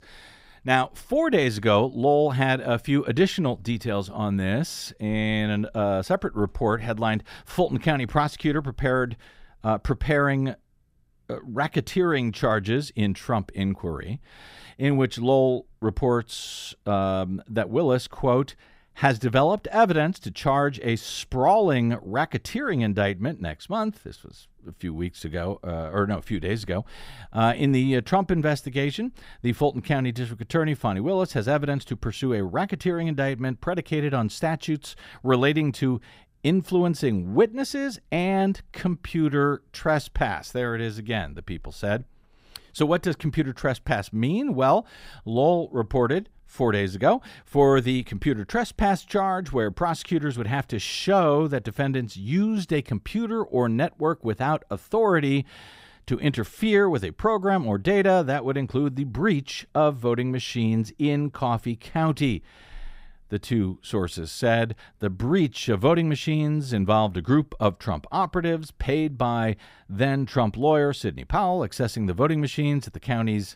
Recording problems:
none

